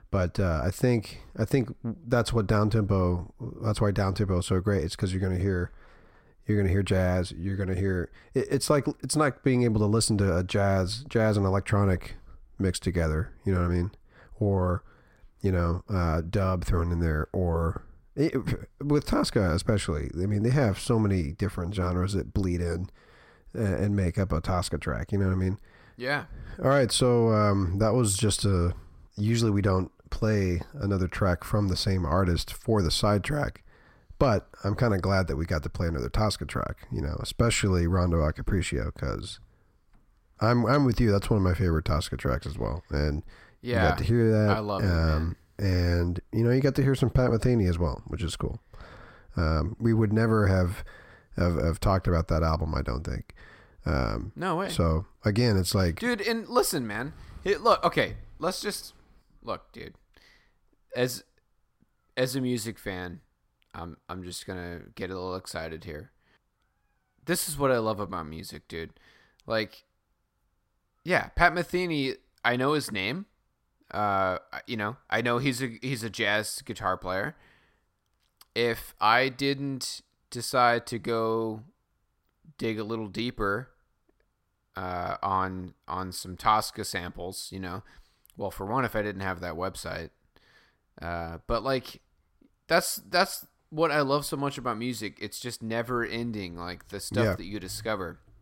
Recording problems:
none

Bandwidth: 16 kHz